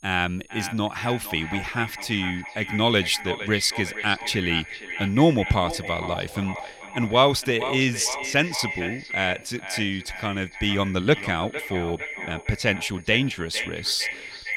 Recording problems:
echo of what is said; strong; throughout; 460 ms later, 9 dB below the speech
high-pitched whine; faint; throughout; 6.5 kHz, 30 dB below the speech

